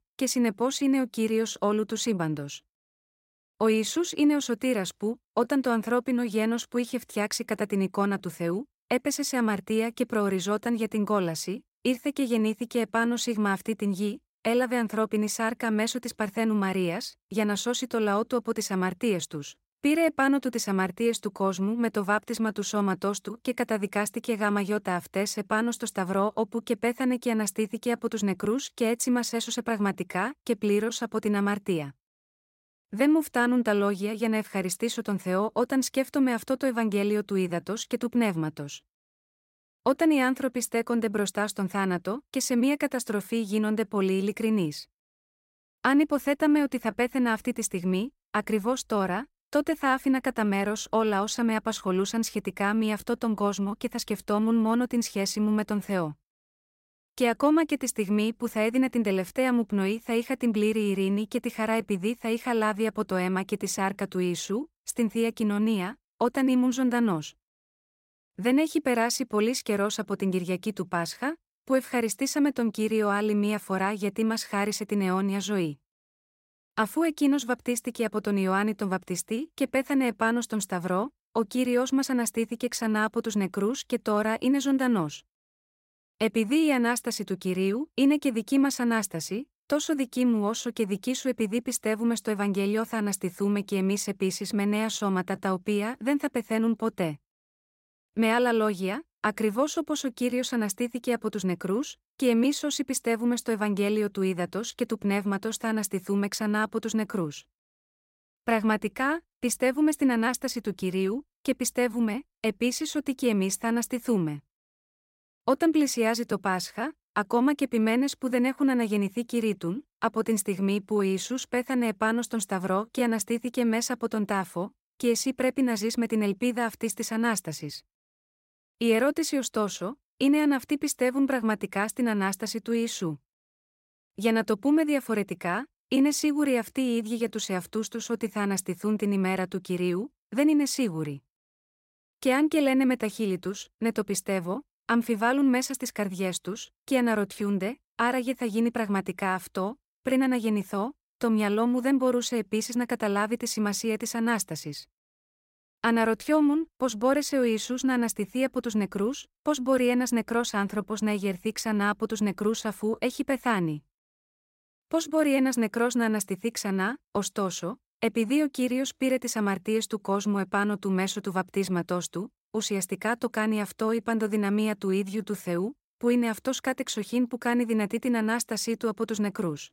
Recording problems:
none

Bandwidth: 16 kHz